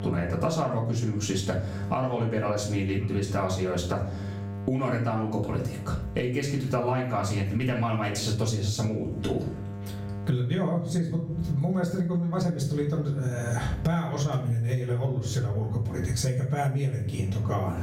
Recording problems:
off-mic speech; far
squashed, flat; heavily
room echo; slight; dies away in 0.4 s
electrical hum; noticeable; throughout; 50 Hz, 20 dB below the speech

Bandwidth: 16 kHz